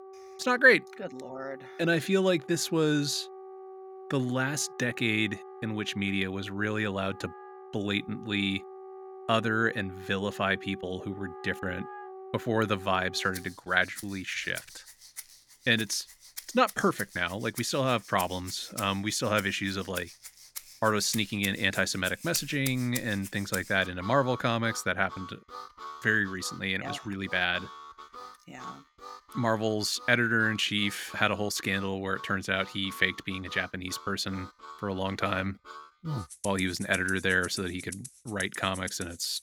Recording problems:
background music; noticeable; throughout; 15 dB below the speech

